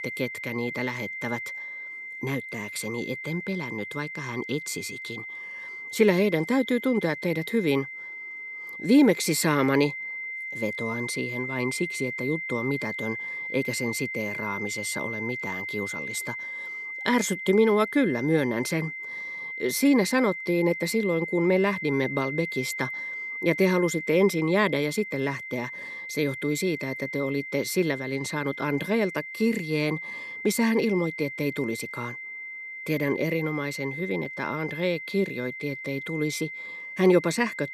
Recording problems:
high-pitched whine; loud; throughout; 2 kHz, 7 dB below the speech

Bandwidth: 14.5 kHz